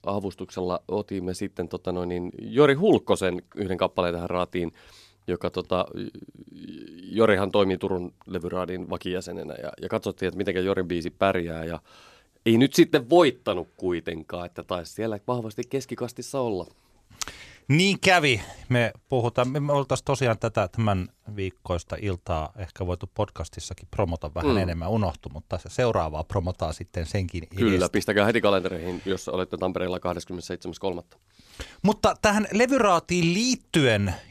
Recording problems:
none

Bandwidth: 14.5 kHz